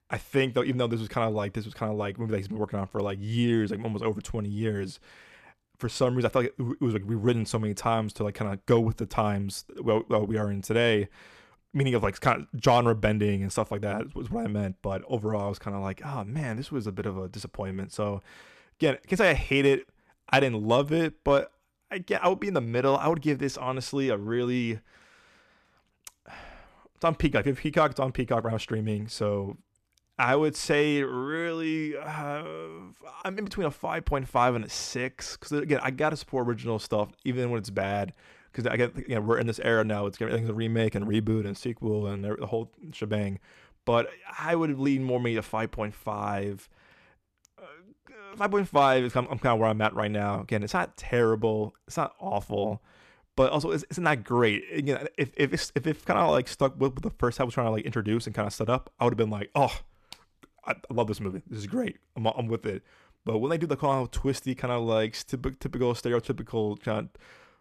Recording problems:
none

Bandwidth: 14.5 kHz